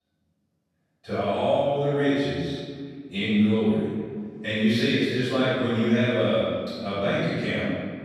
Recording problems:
room echo; strong; dies away in 1.9 s
off-mic speech; far

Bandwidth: 13.5 kHz